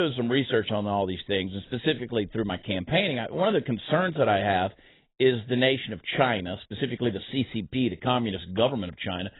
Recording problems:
garbled, watery; badly; nothing above 4 kHz
abrupt cut into speech; at the start

